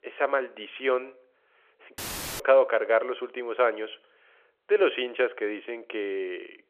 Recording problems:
phone-call audio; nothing above 3 kHz
audio cutting out; filled with static; at 2 s

